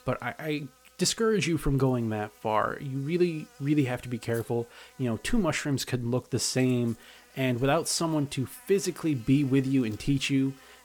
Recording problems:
electrical hum; faint; throughout; 60 Hz, 25 dB below the speech

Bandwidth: 18 kHz